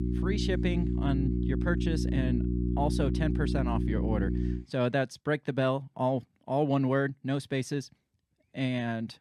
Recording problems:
electrical hum; loud; until 4.5 s; 60 Hz, 5 dB below the speech

